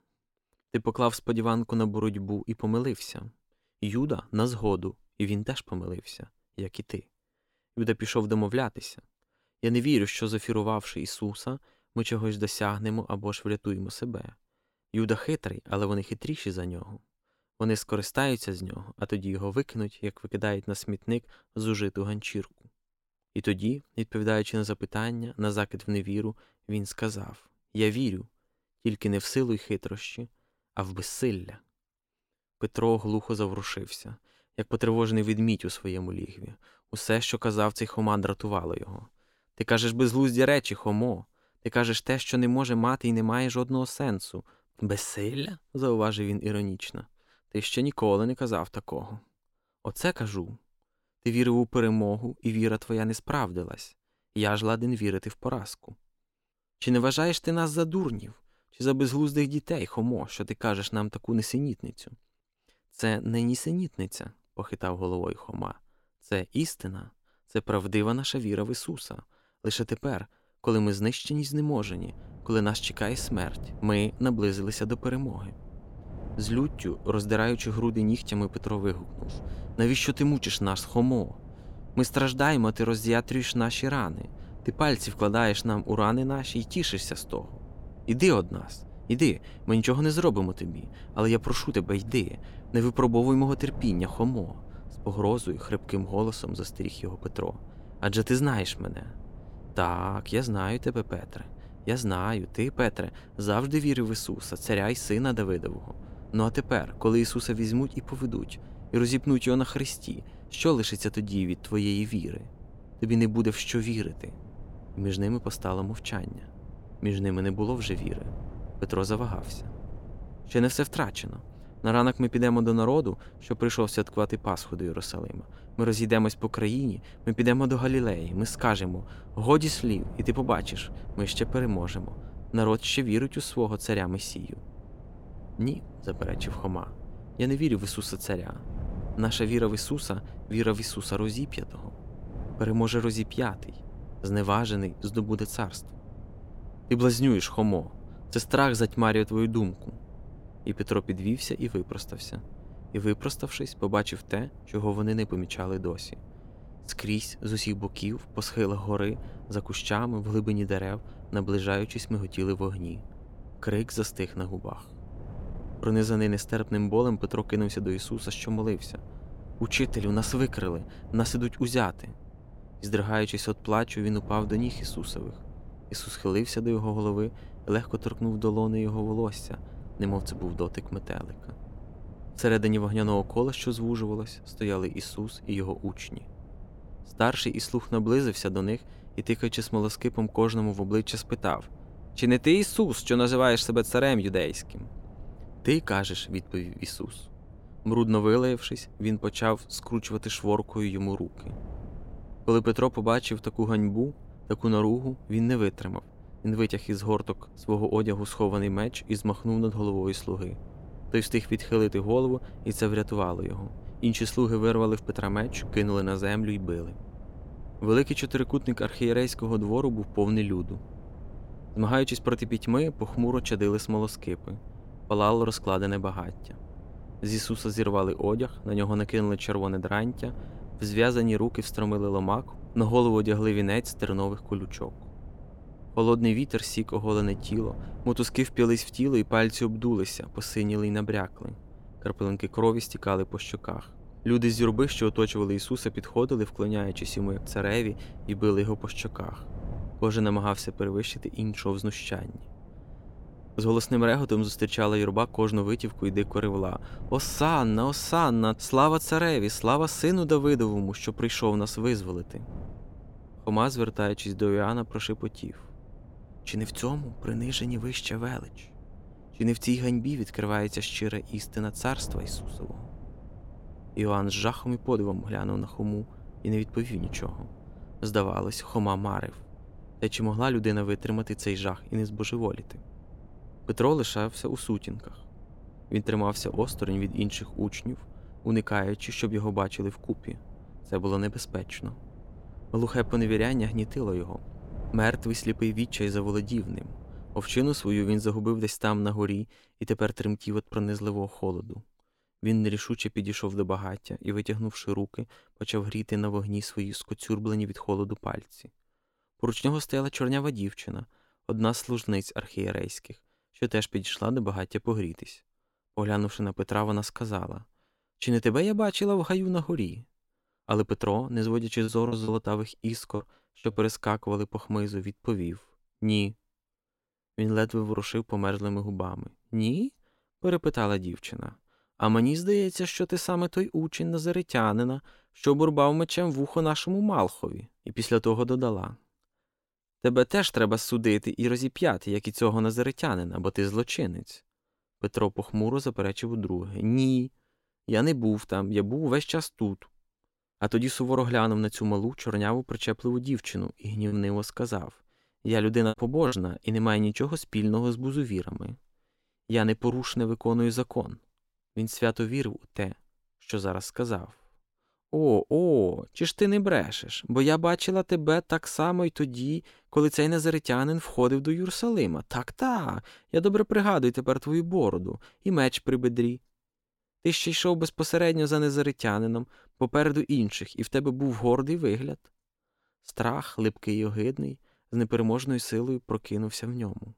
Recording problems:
wind noise on the microphone; occasional gusts; from 1:12 to 4:58; 25 dB below the speech
choppy; occasionally; from 5:22 to 5:24 and from 5:54 to 5:56; 5% of the speech affected

